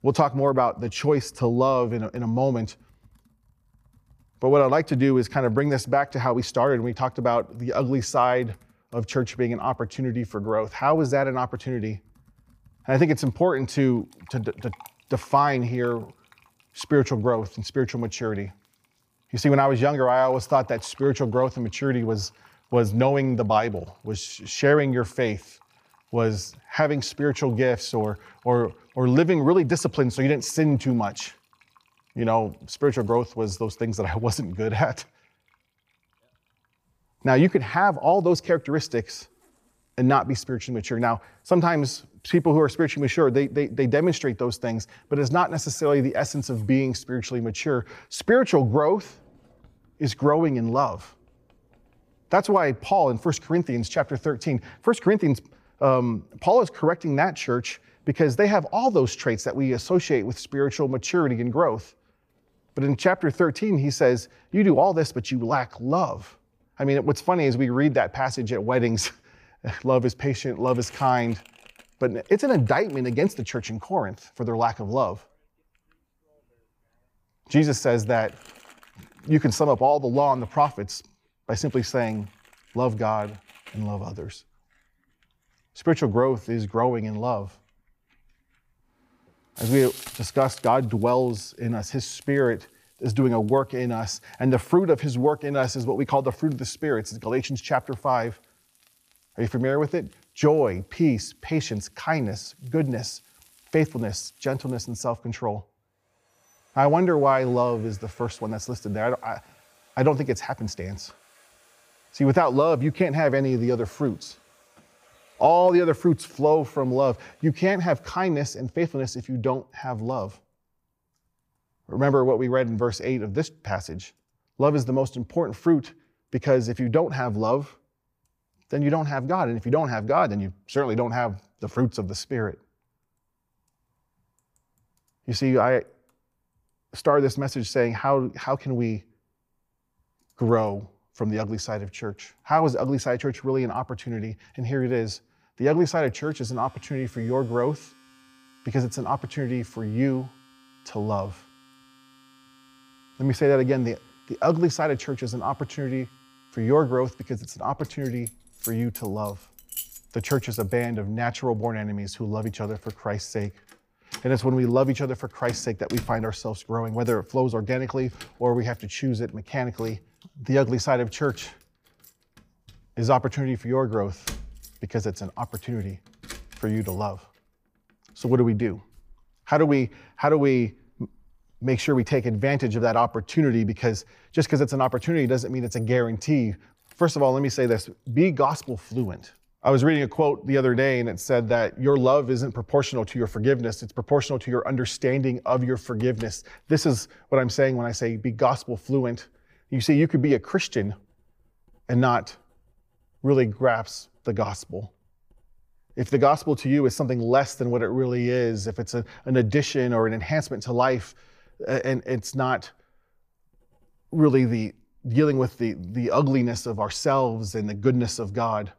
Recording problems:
household noises; faint; throughout; 25 dB below the speech

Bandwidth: 15 kHz